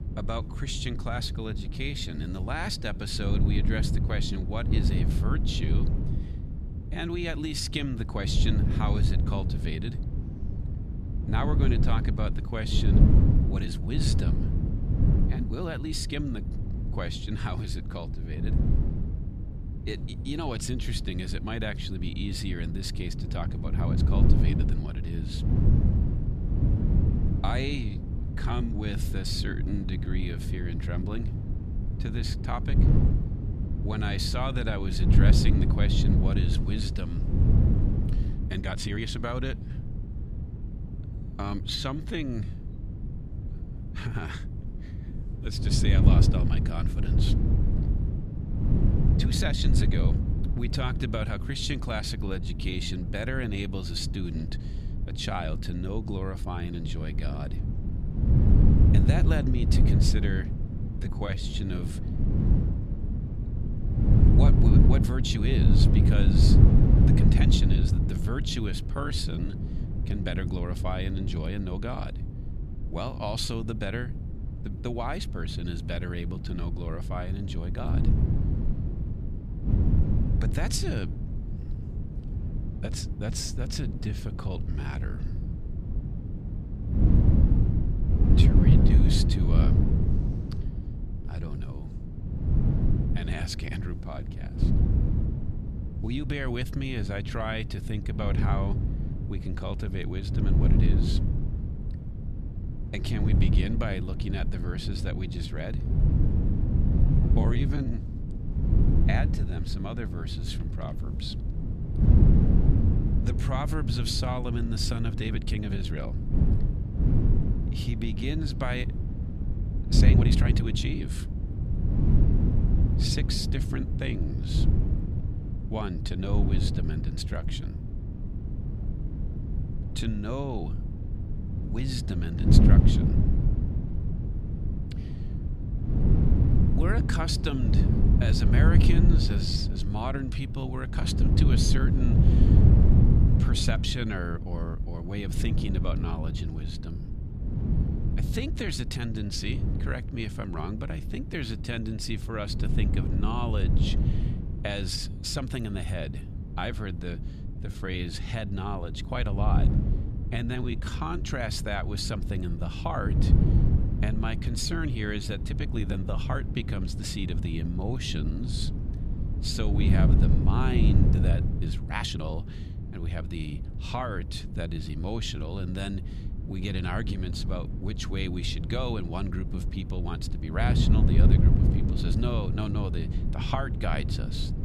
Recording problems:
wind noise on the microphone; heavy; 4 dB below the speech
uneven, jittery; strongly; from 7 s to 2:52

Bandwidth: 14 kHz